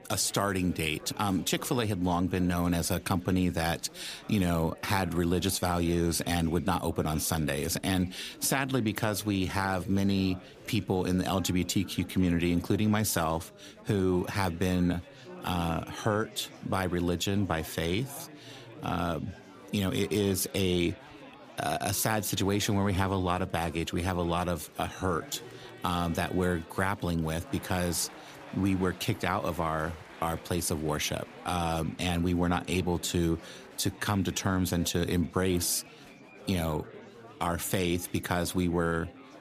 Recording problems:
chatter from many people; noticeable; throughout; 20 dB below the speech

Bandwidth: 15 kHz